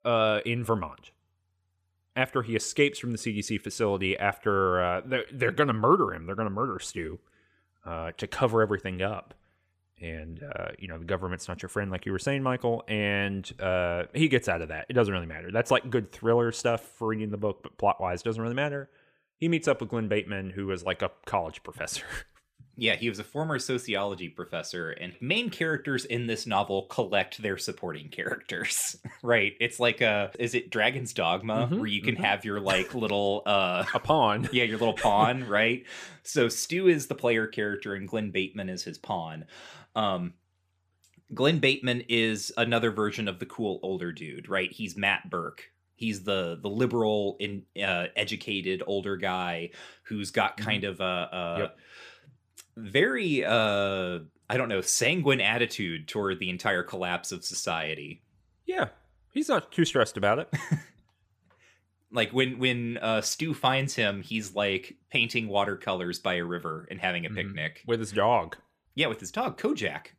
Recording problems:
none

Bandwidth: 15 kHz